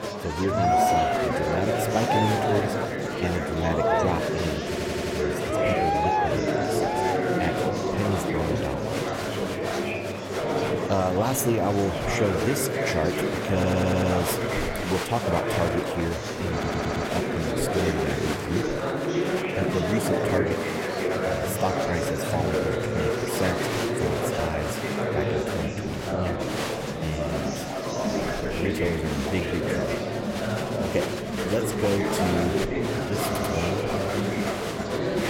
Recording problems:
murmuring crowd; very loud; throughout; 3 dB above the speech
crackling; faint; from 1 to 4 s and from 28 to 30 s; 25 dB below the speech
audio stuttering; 4 times, first at 4.5 s

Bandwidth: 16.5 kHz